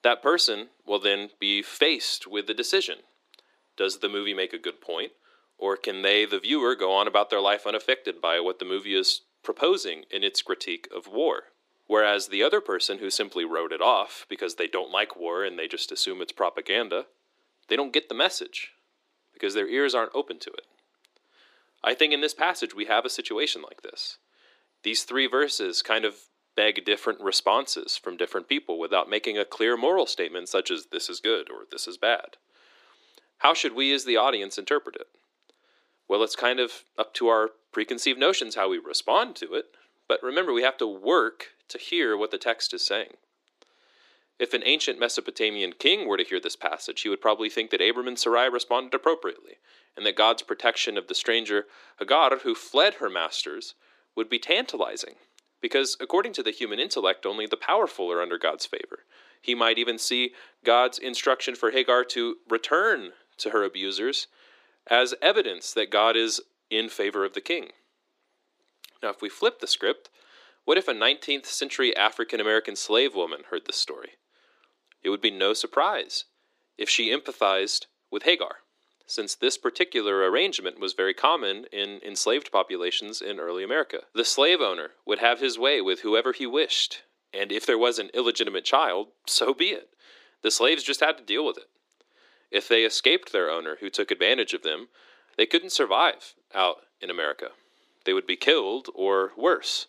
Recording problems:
thin; very; fading below 300 Hz

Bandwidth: 15 kHz